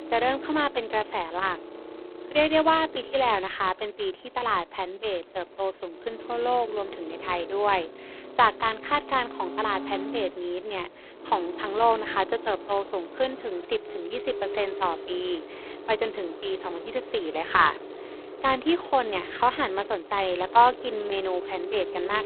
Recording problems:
phone-call audio; poor line; nothing above 4 kHz
traffic noise; noticeable; throughout; 15 dB below the speech

